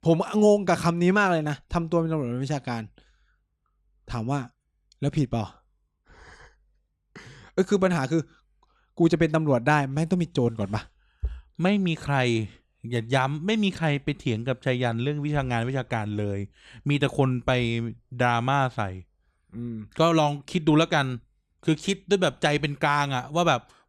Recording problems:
none

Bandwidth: 15 kHz